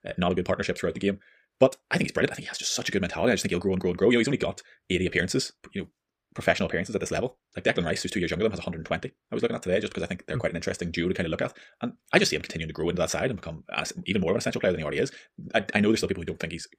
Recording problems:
wrong speed, natural pitch; too fast; 1.6 times normal speed

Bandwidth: 15 kHz